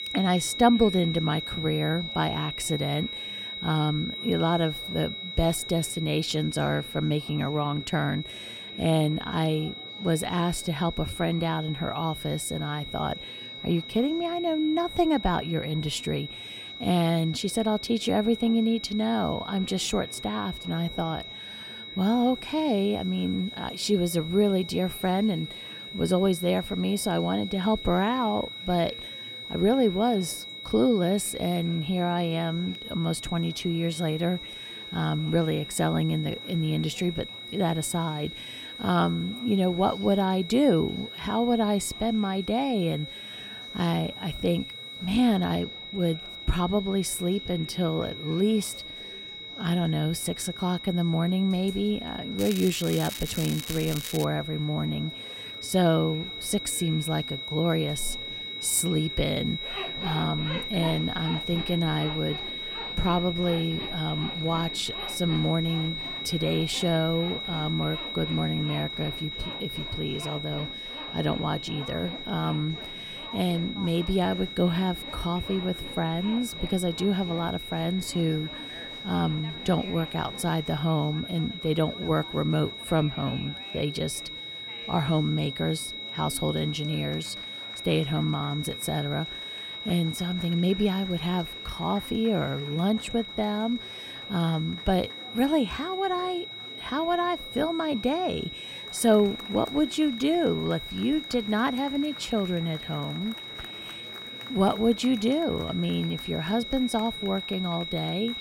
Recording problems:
high-pitched whine; loud; throughout; 4 kHz, 8 dB below the speech
crackling; loud; from 52 to 54 s; 9 dB below the speech
household noises; noticeable; throughout; 20 dB below the speech
murmuring crowd; faint; throughout; 20 dB below the speech

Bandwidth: 16 kHz